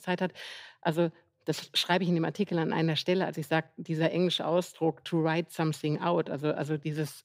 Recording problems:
none

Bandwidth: 15.5 kHz